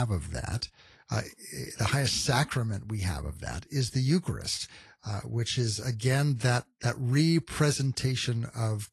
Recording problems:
garbled, watery; slightly; nothing above 11.5 kHz
abrupt cut into speech; at the start

